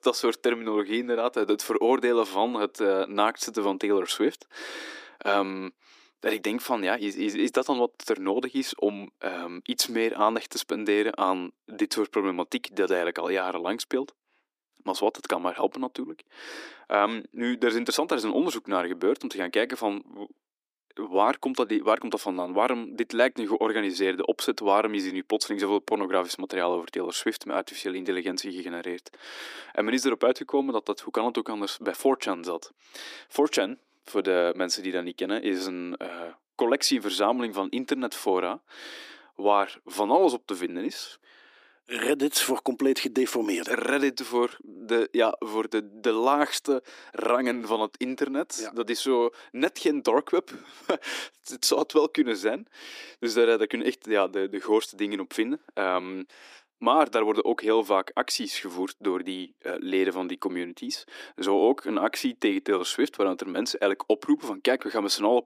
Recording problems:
thin; somewhat; fading below 300 Hz

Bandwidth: 15 kHz